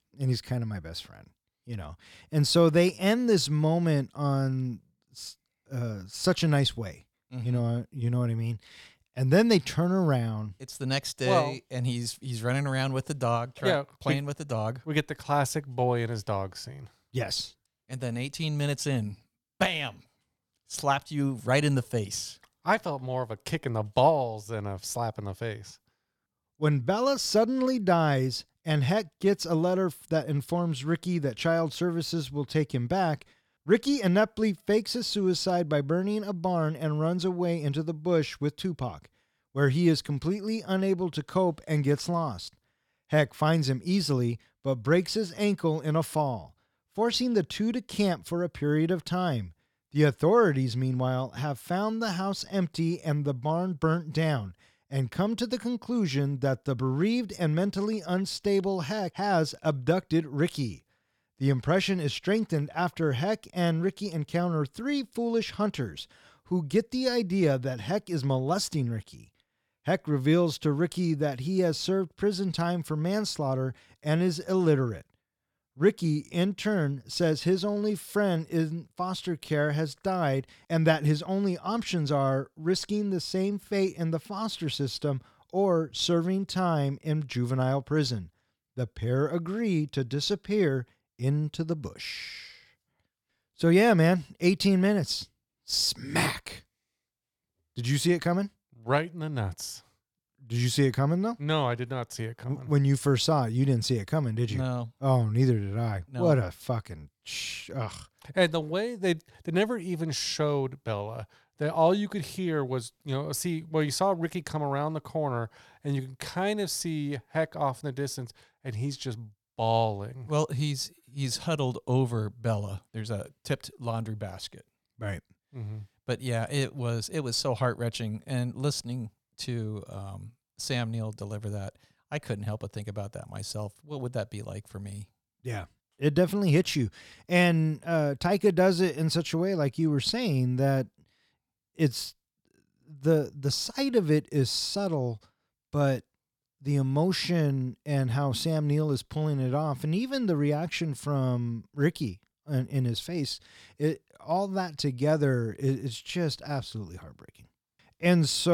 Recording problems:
abrupt cut into speech; at the end

